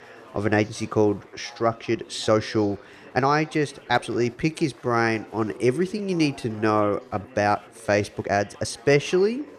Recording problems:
chatter from many people; faint; throughout; 20 dB below the speech
uneven, jittery; strongly; from 0.5 to 9 s

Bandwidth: 14 kHz